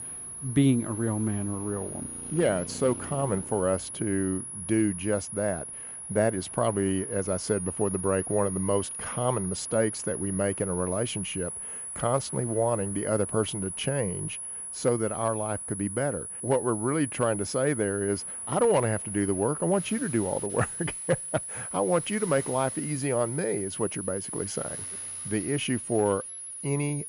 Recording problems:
high-pitched whine; loud; throughout; 10.5 kHz, 6 dB below the speech
traffic noise; faint; throughout; 25 dB below the speech

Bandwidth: 14.5 kHz